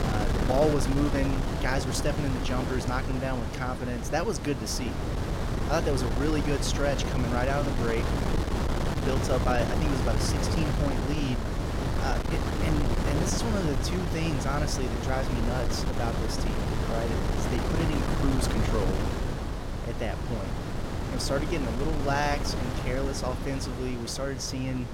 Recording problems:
wind noise on the microphone; heavy; 2 dB below the speech

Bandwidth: 16.5 kHz